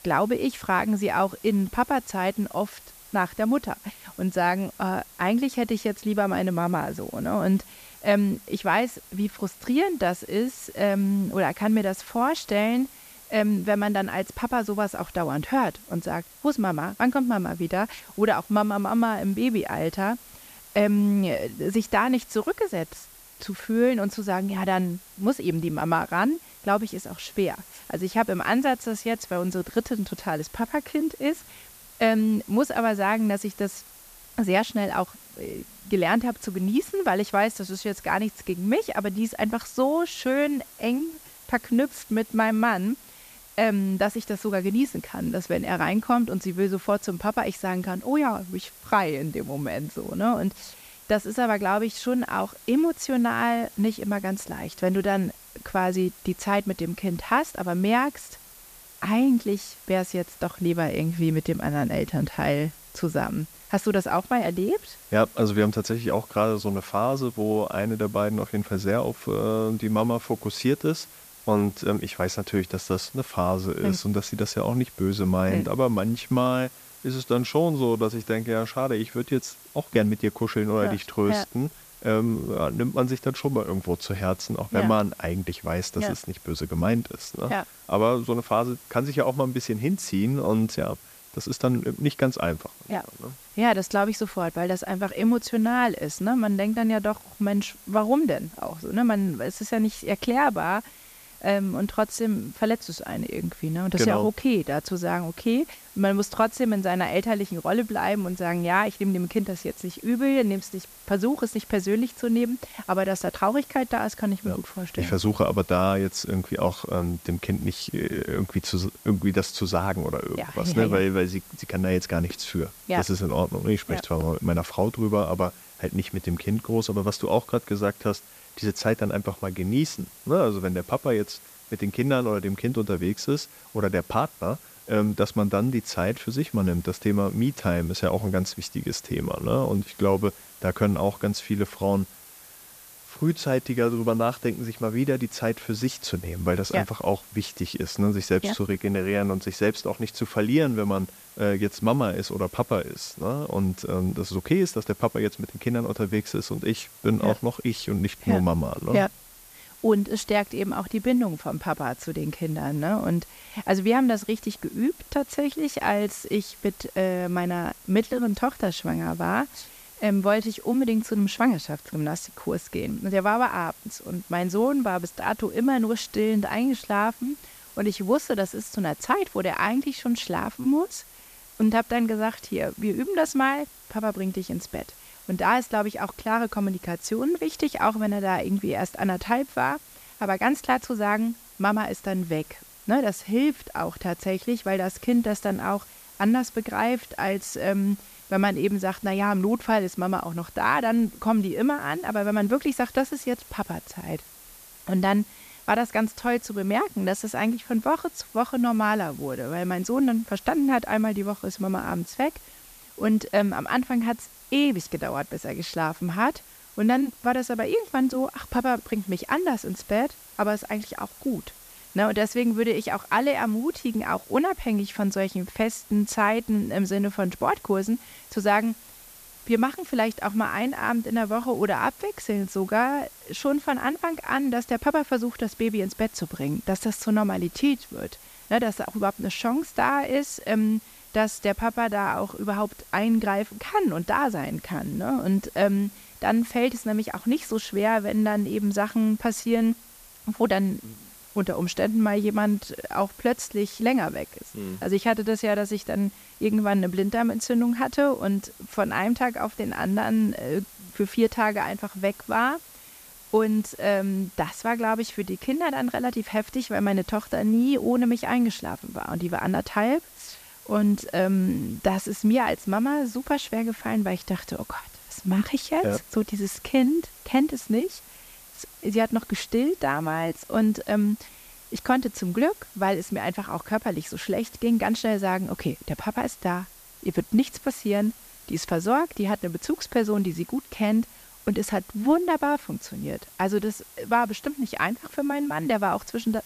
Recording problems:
hiss; noticeable; throughout; 20 dB below the speech

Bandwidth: 14.5 kHz